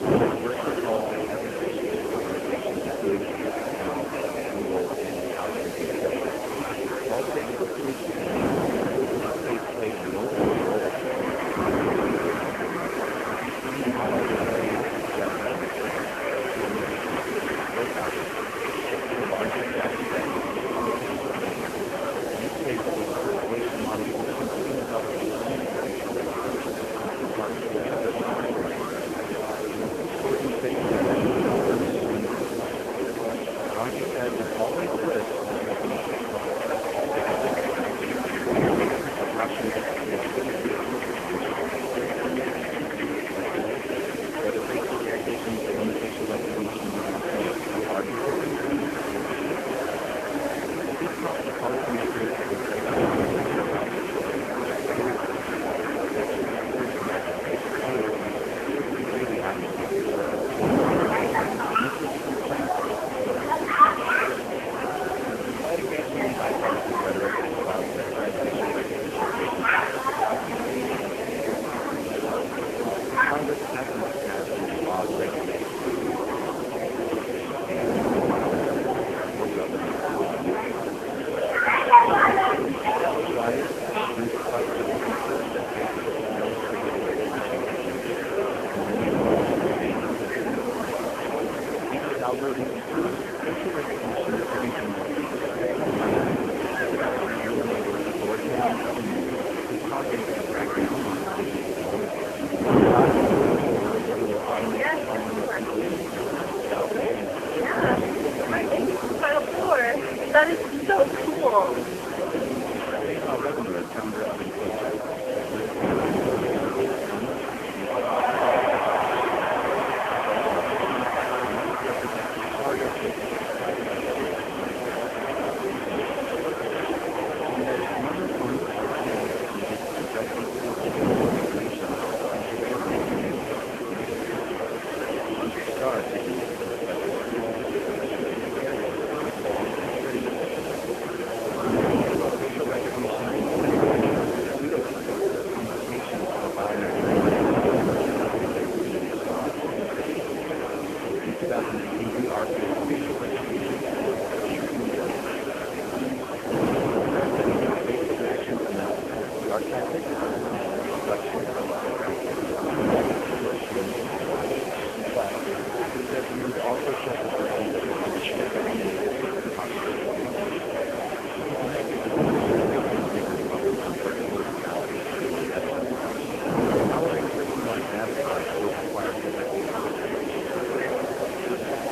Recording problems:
phone-call audio; poor line
murmuring crowd; very loud; throughout; 5 dB above the speech
wind noise on the microphone; heavy; as loud as the speech
traffic noise; noticeable; until 2:25; 15 dB below the speech
hiss; noticeable; throughout; 10 dB below the speech

